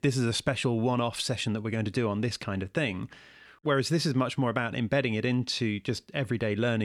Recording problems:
abrupt cut into speech; at the end

